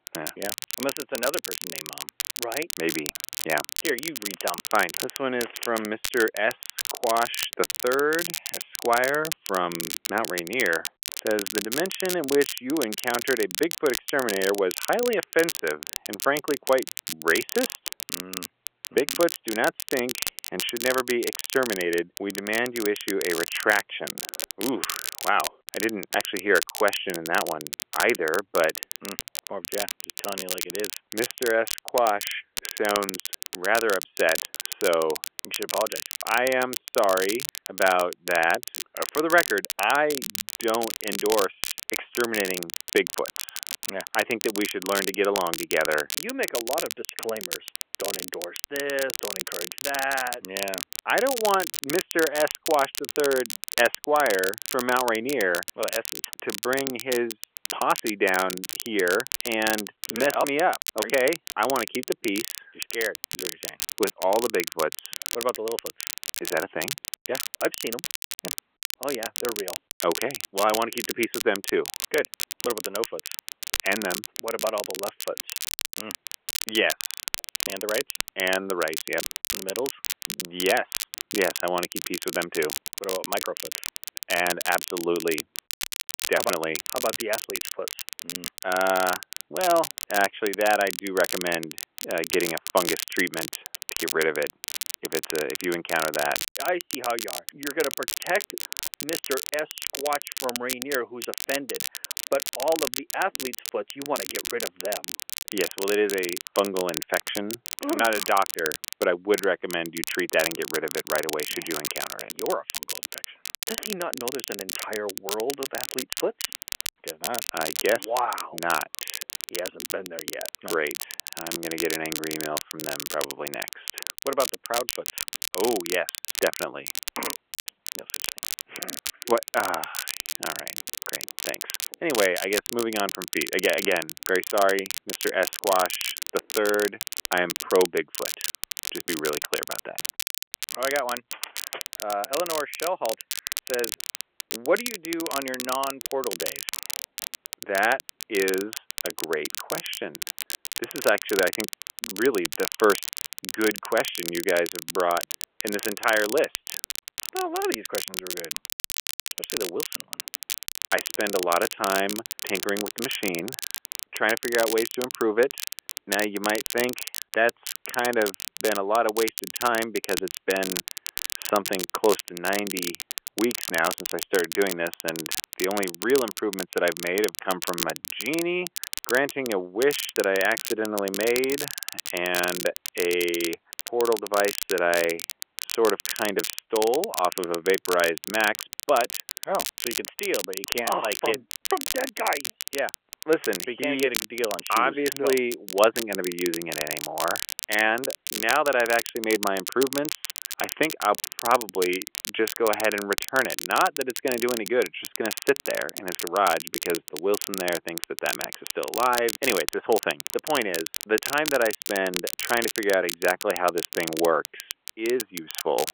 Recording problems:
phone-call audio; nothing above 3.5 kHz
crackle, like an old record; loud; 5 dB below the speech

